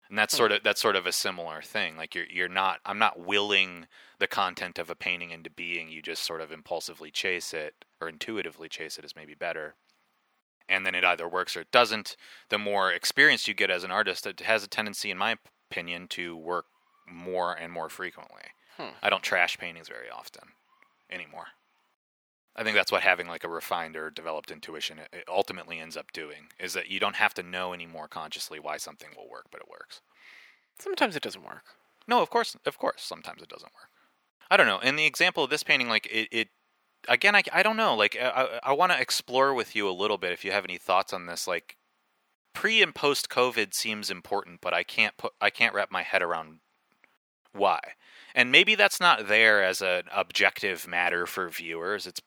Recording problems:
thin; very; fading below 500 Hz

